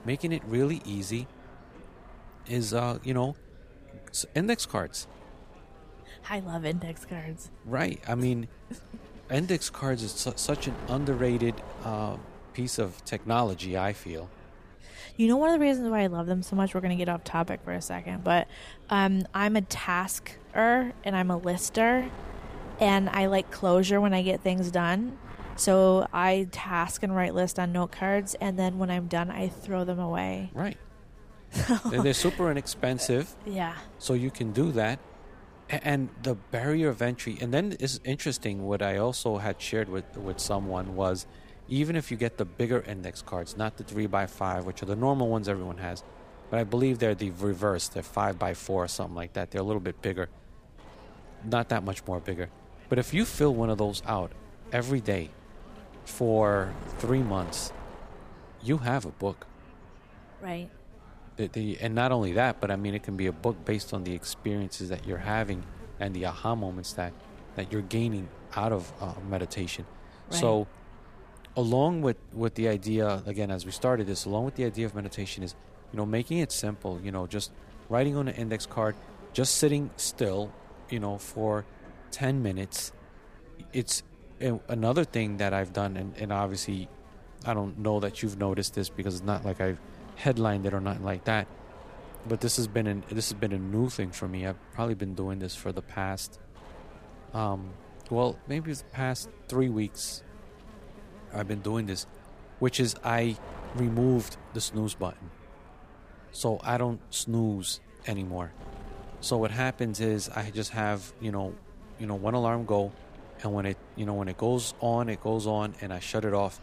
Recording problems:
wind noise on the microphone; occasional gusts; 20 dB below the speech
electrical hum; faint; throughout; 50 Hz, 30 dB below the speech
background chatter; faint; throughout; 4 voices, 30 dB below the speech

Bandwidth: 15 kHz